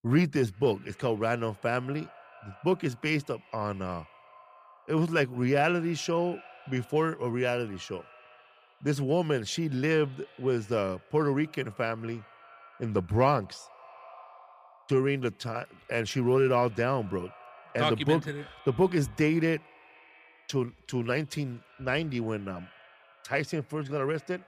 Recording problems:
echo of what is said; faint; throughout; 180 ms later, 25 dB below the speech

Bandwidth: 15 kHz